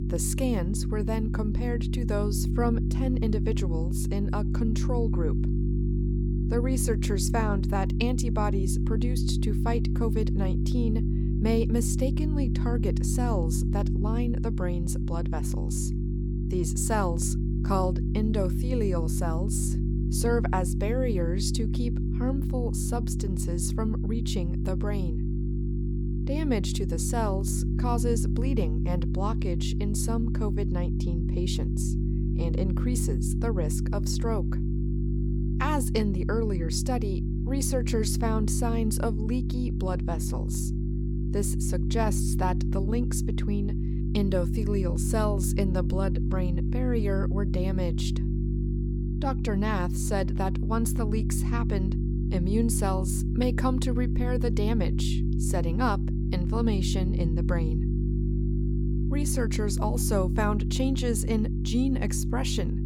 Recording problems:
electrical hum; loud; throughout; 50 Hz, 6 dB below the speech

